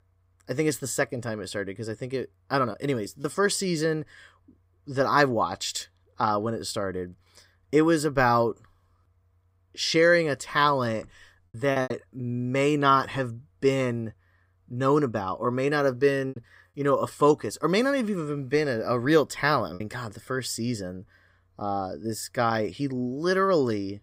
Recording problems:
choppy; occasionally; 2% of the speech affected

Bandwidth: 15.5 kHz